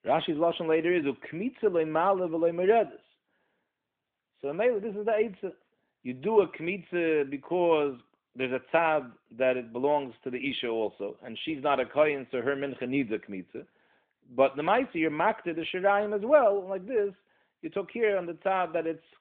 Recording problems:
phone-call audio; nothing above 3.5 kHz

